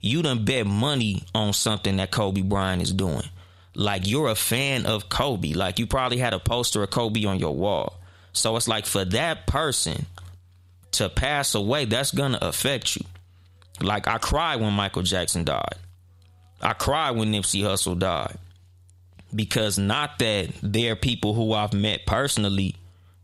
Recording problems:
squashed, flat; heavily

